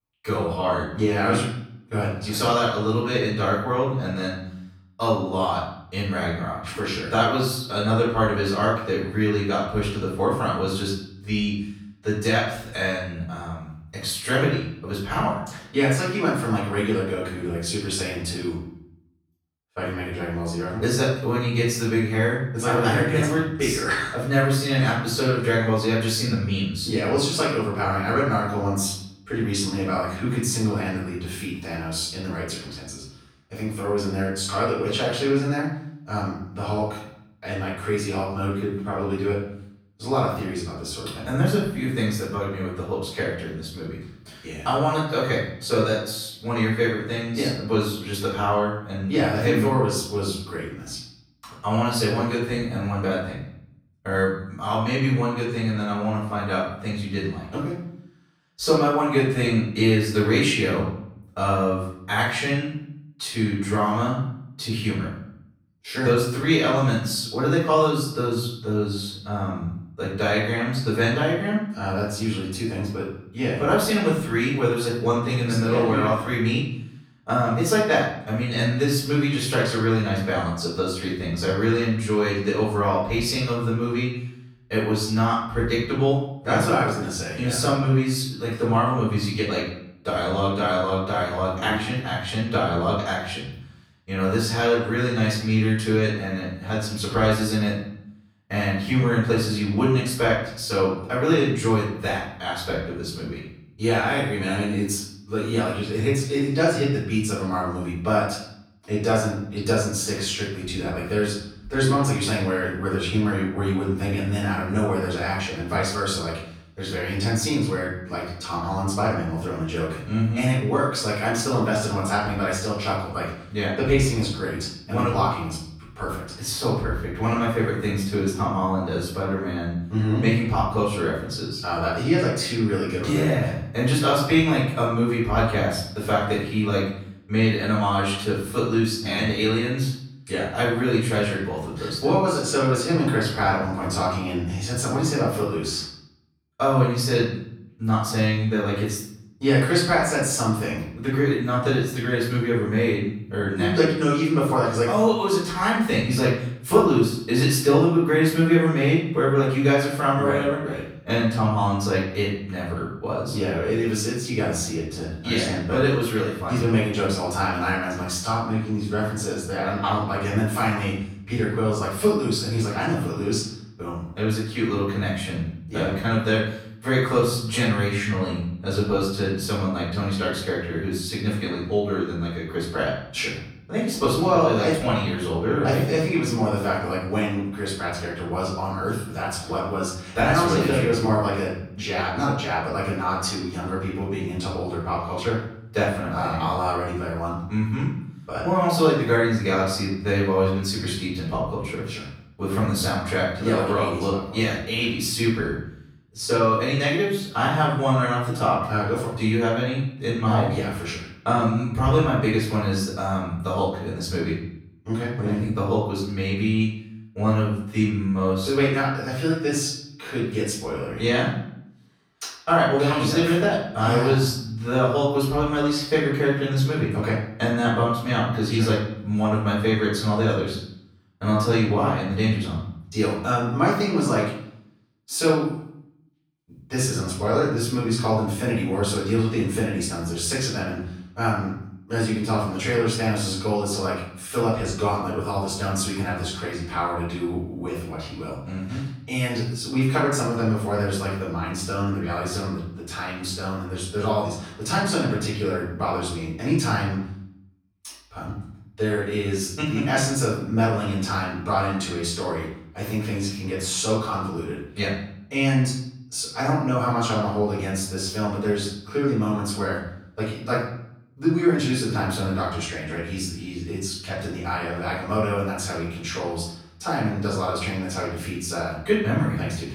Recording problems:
off-mic speech; far
room echo; noticeable; dies away in 0.6 s

